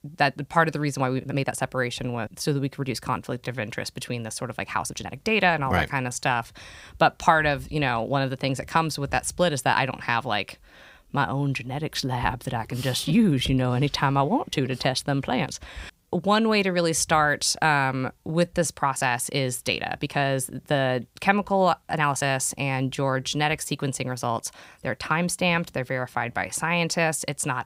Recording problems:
uneven, jittery; strongly; from 1 to 27 s

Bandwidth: 15.5 kHz